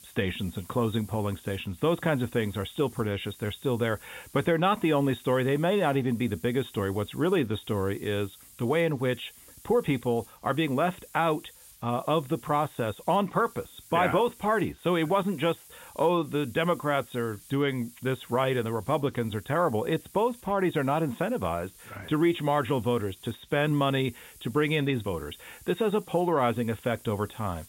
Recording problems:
high frequencies cut off; severe; nothing above 4 kHz
hiss; faint; throughout; 20 dB below the speech

